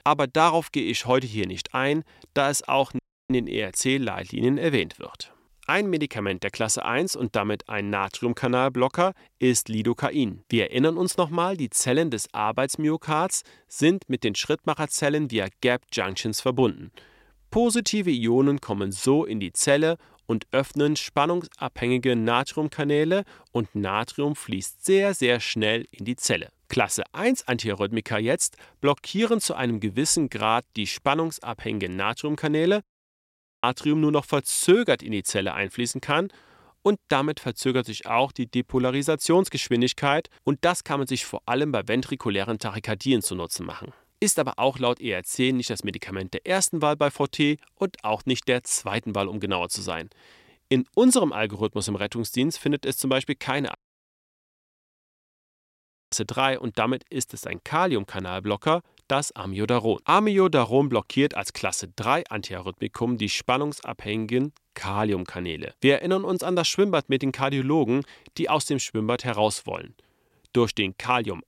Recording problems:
audio cutting out; at 3 s, at 33 s for 1 s and at 54 s for 2.5 s

